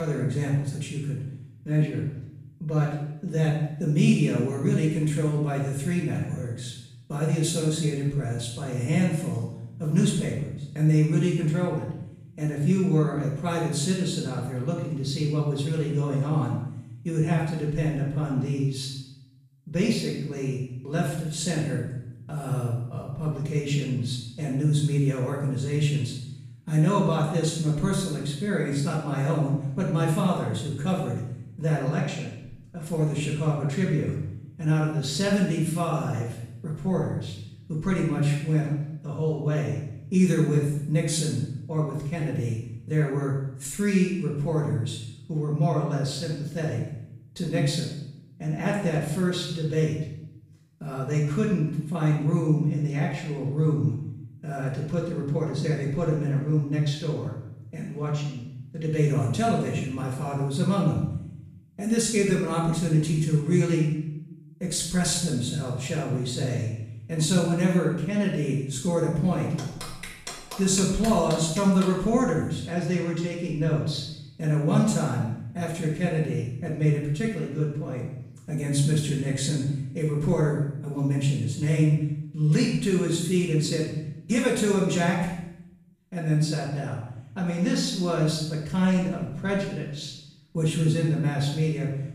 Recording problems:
off-mic speech; far
room echo; noticeable; dies away in 0.8 s
abrupt cut into speech; at the start

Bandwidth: 15 kHz